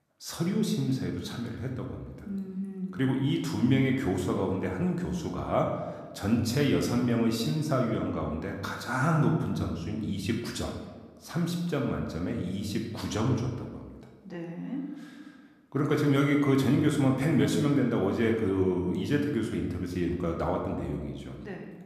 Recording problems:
room echo; noticeable; dies away in 1.1 s
off-mic speech; somewhat distant

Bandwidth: 14.5 kHz